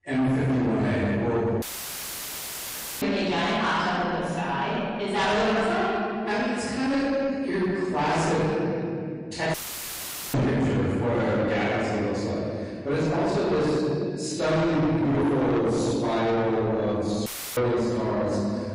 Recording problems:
distortion; heavy; 7 dB below the speech
room echo; strong; dies away in 2.3 s
off-mic speech; far
garbled, watery; slightly; nothing above 10.5 kHz
audio cutting out; filled with static; at 1.5 s for 1.5 s, at 9.5 s for 1 s and at 17 s

